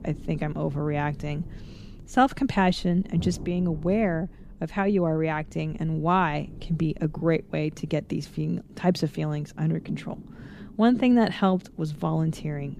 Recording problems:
low rumble; faint; throughout; 20 dB below the speech

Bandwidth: 15 kHz